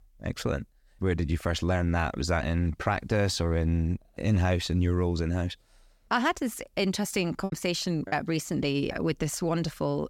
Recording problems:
choppy; very; at 7.5 s; 6% of the speech affected

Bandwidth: 17 kHz